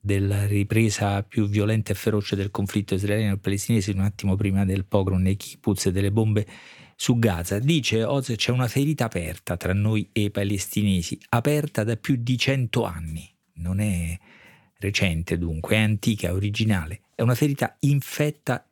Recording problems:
none

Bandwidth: 18 kHz